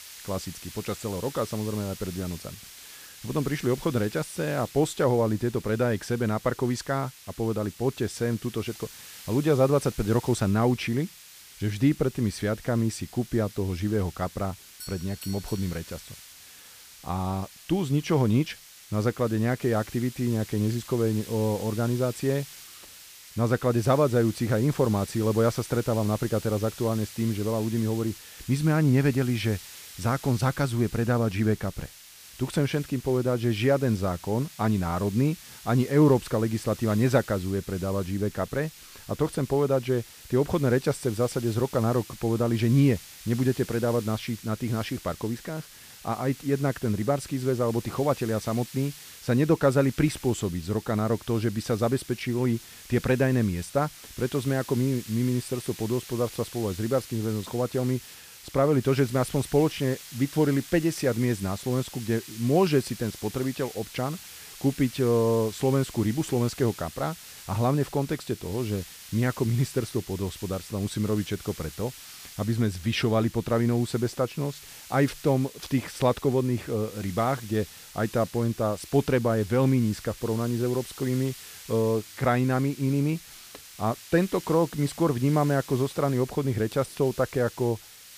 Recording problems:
hiss; noticeable; throughout; 15 dB below the speech
doorbell; faint; from 15 to 16 s; peak 15 dB below the speech

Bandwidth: 15 kHz